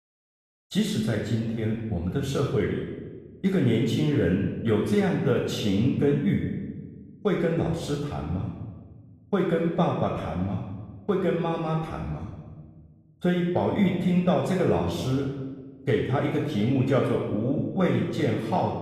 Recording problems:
room echo; noticeable; dies away in 1.1 s
off-mic speech; somewhat distant

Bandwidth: 14.5 kHz